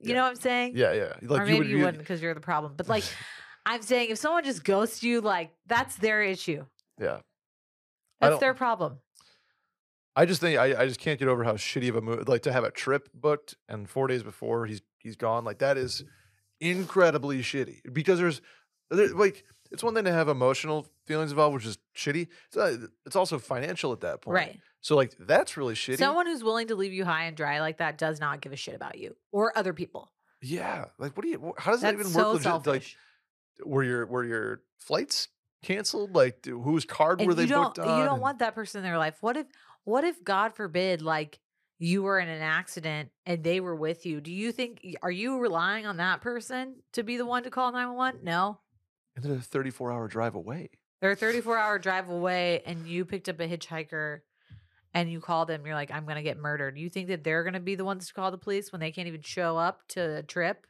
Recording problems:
none

